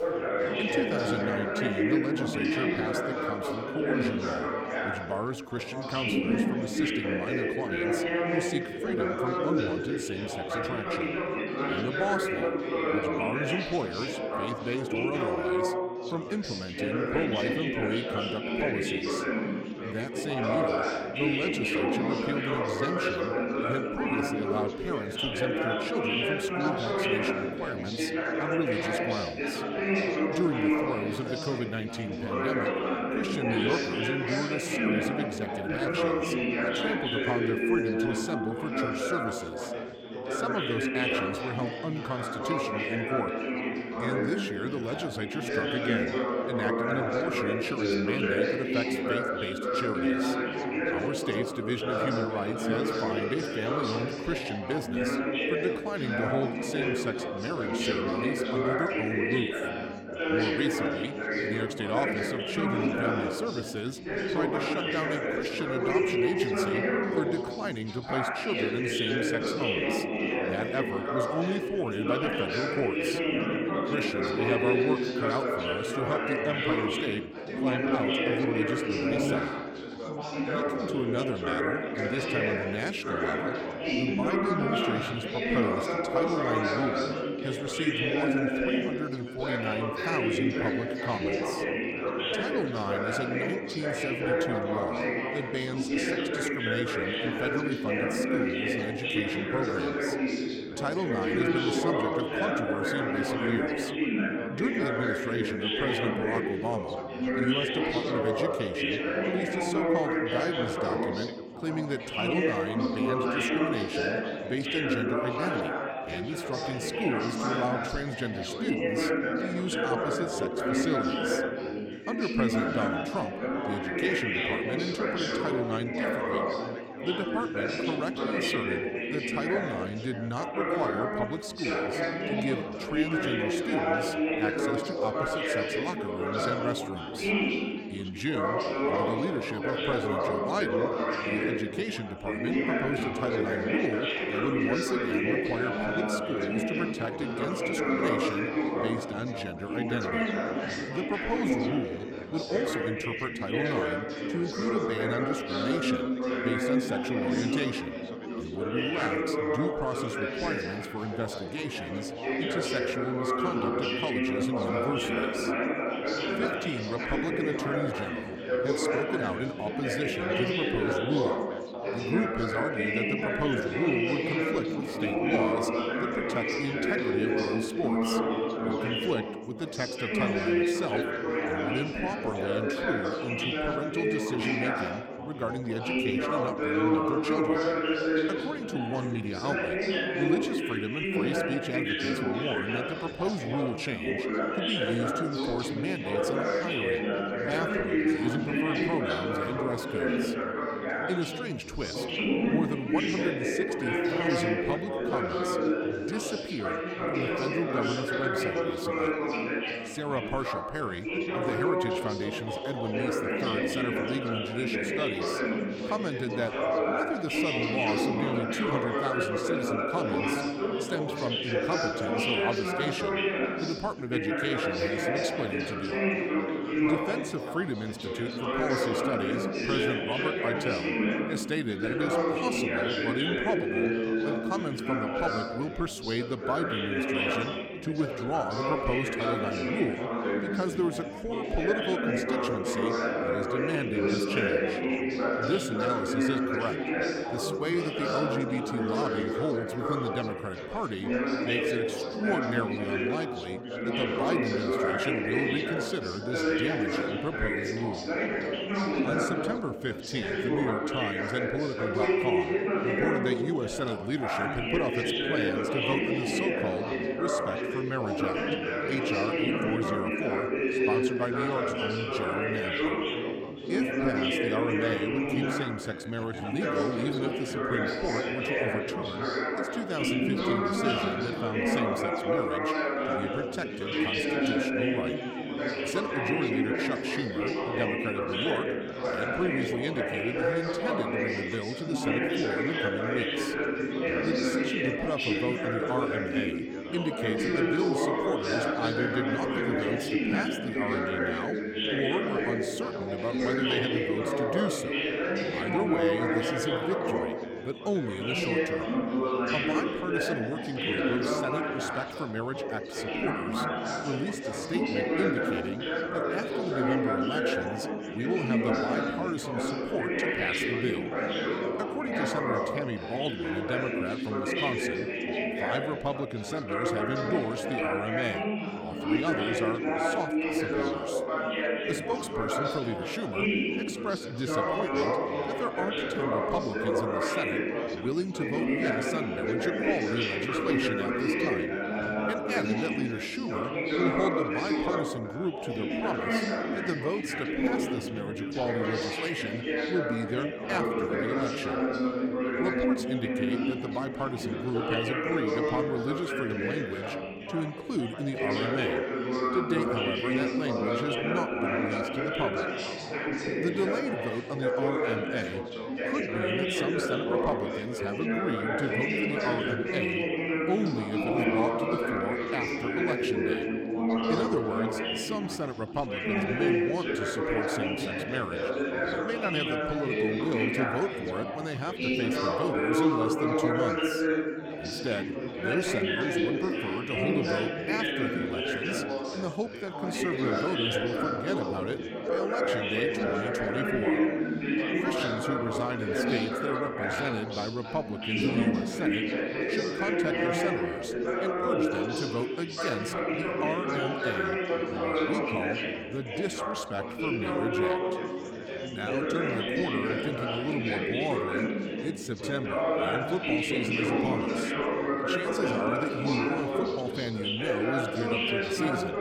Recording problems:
chatter from many people; very loud; throughout; 5 dB above the speech

